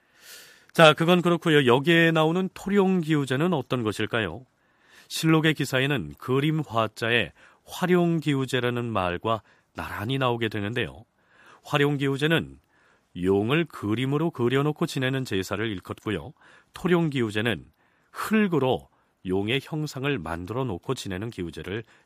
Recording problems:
none

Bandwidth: 15 kHz